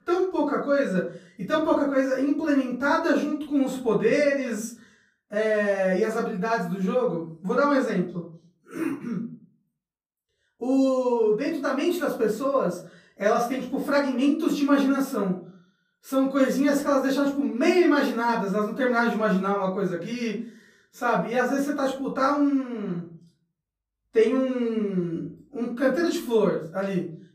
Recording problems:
off-mic speech; far
room echo; slight; dies away in 0.4 s

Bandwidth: 15 kHz